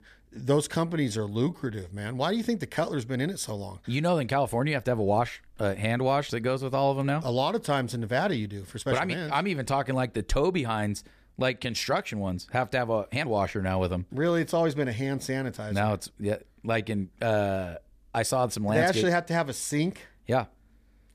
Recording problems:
uneven, jittery; strongly; from 1 to 19 s

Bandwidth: 14.5 kHz